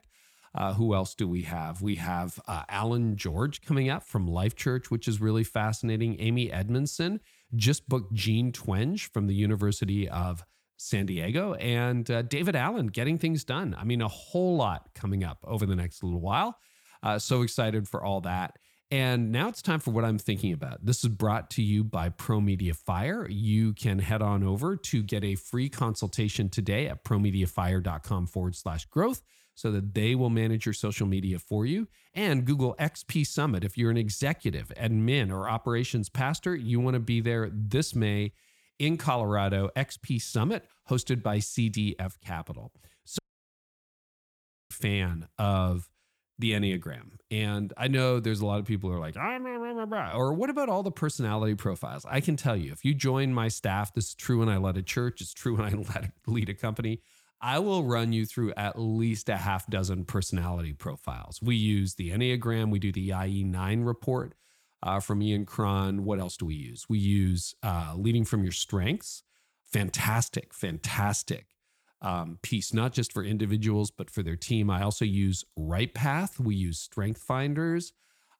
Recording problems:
audio cutting out; at 43 s for 1.5 s

